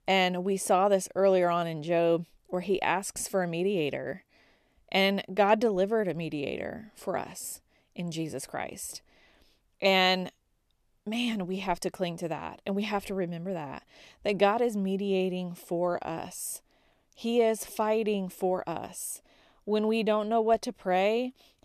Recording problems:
none

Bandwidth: 14 kHz